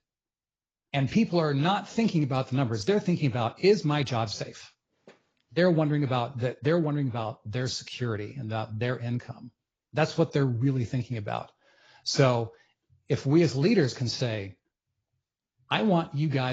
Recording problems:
garbled, watery; badly
abrupt cut into speech; at the end

